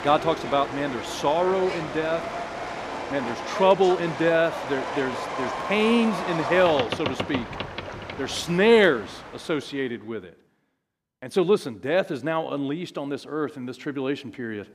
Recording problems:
train or aircraft noise; loud; until 9.5 s; 7 dB below the speech

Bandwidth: 14.5 kHz